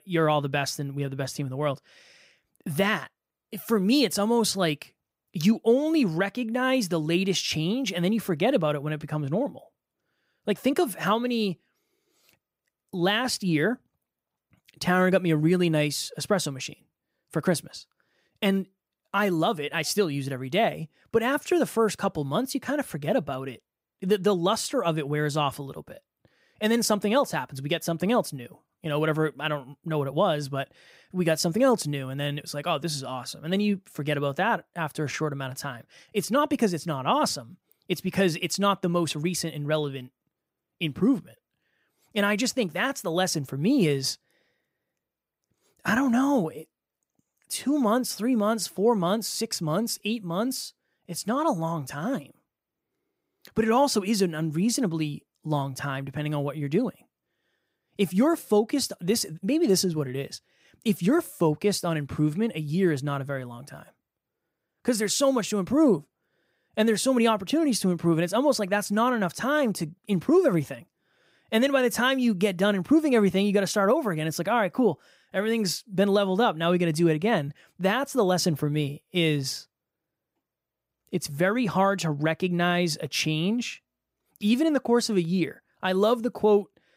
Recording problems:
none

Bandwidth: 15.5 kHz